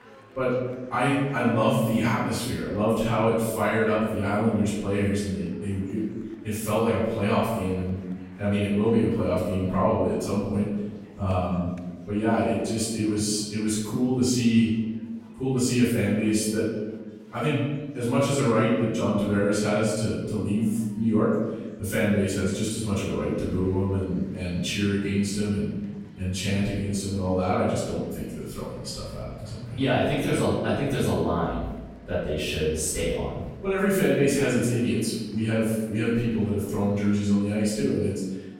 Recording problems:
room echo; strong; dies away in 1.2 s
off-mic speech; far
chatter from many people; faint; throughout; 25 dB below the speech

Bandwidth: 16 kHz